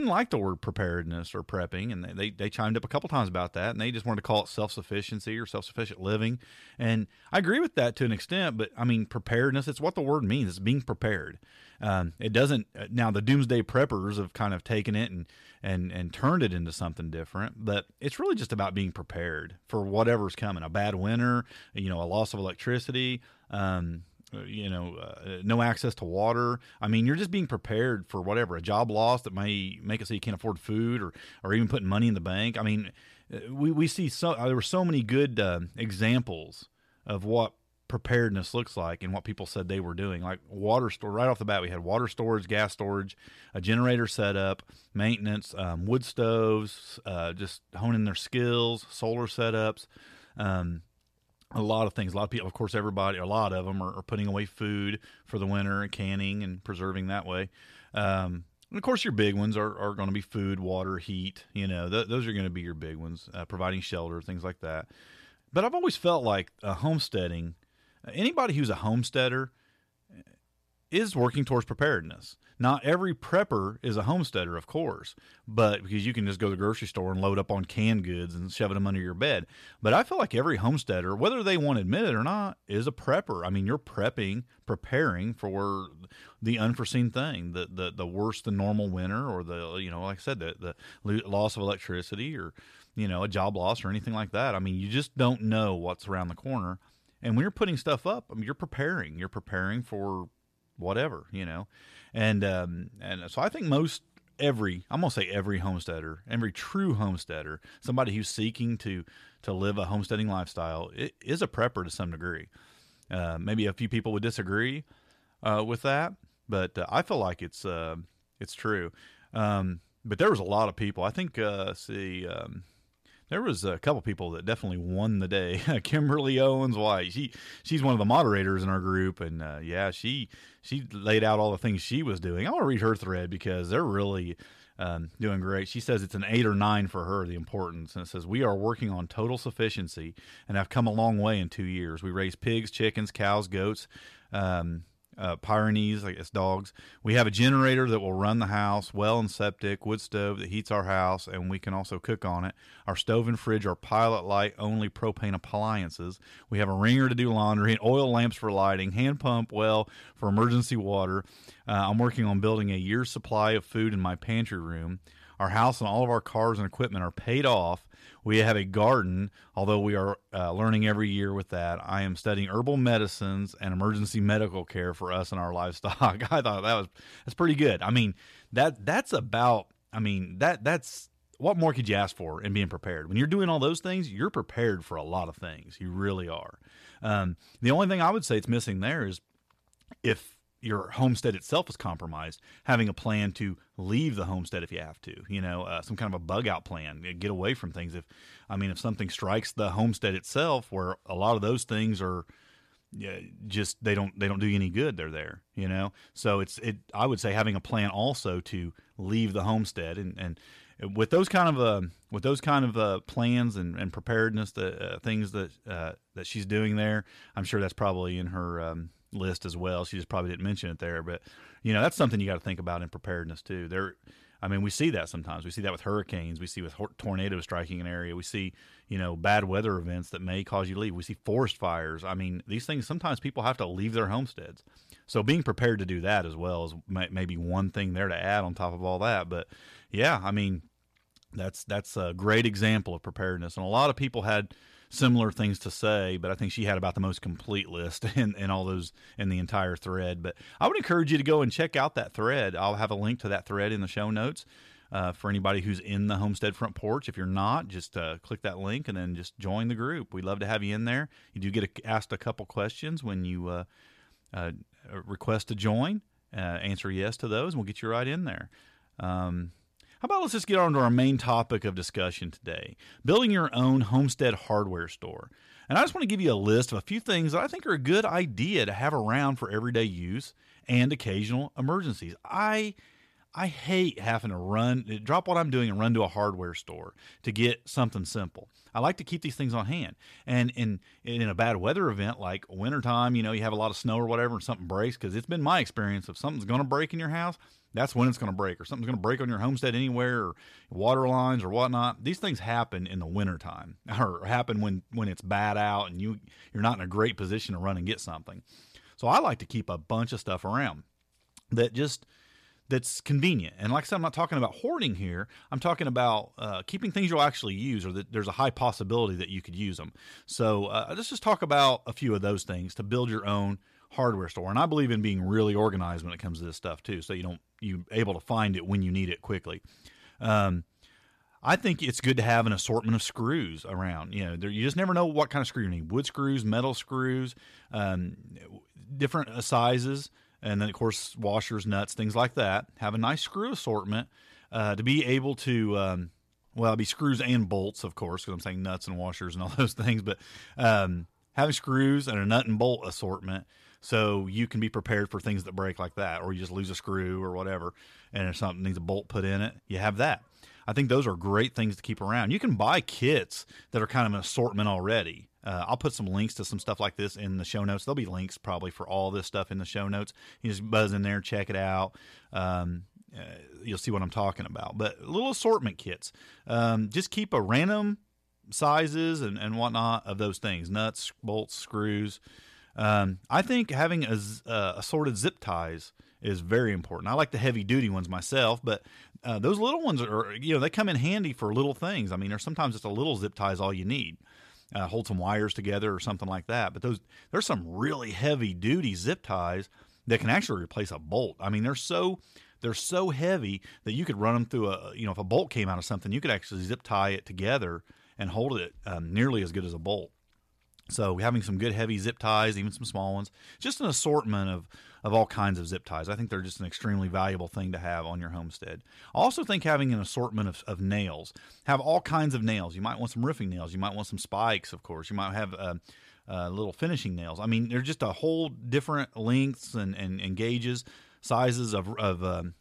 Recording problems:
abrupt cut into speech; at the start

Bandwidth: 14.5 kHz